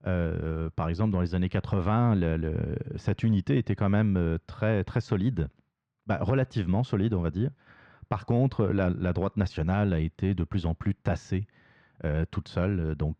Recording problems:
muffled; slightly; fading above 3 kHz

